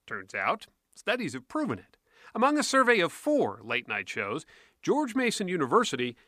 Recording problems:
none

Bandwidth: 15 kHz